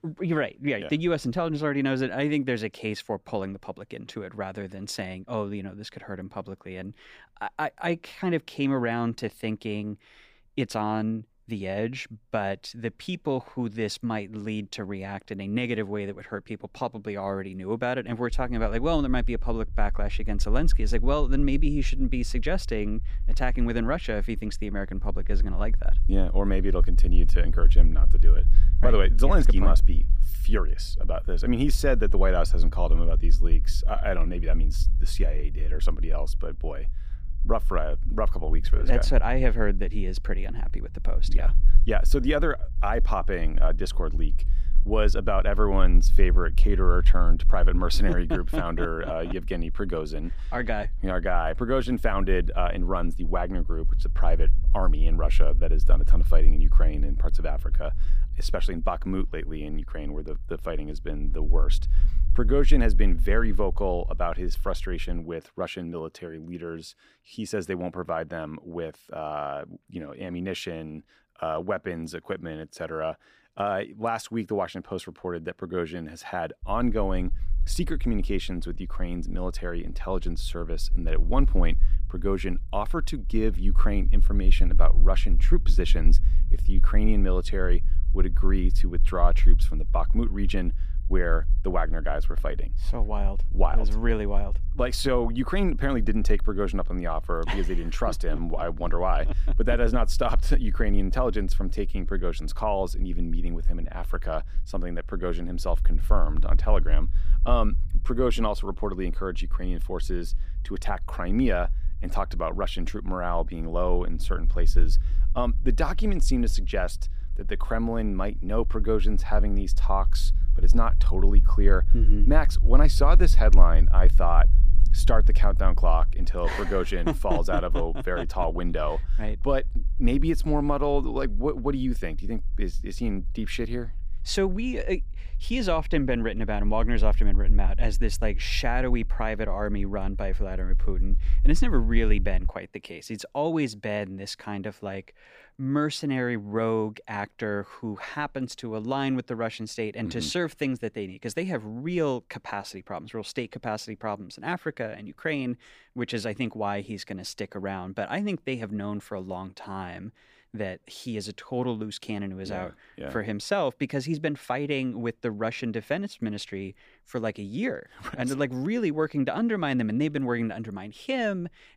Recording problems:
low rumble; faint; from 18 s to 1:05 and from 1:17 to 2:22; 20 dB below the speech

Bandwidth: 15 kHz